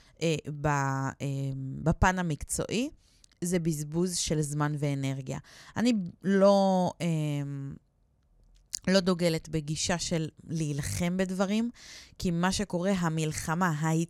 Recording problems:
none

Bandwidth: 18 kHz